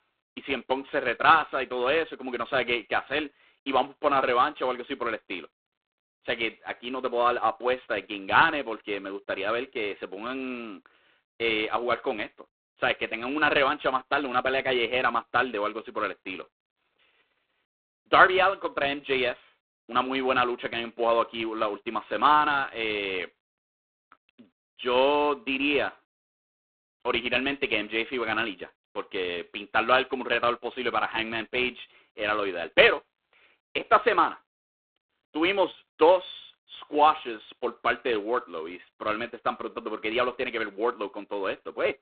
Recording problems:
phone-call audio; poor line

